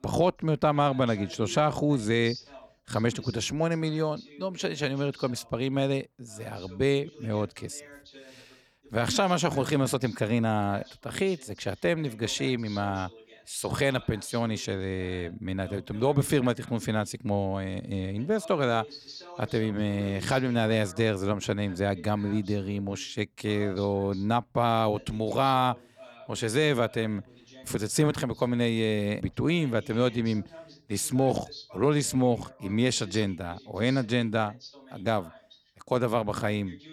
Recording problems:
voice in the background; faint; throughout; 20 dB below the speech

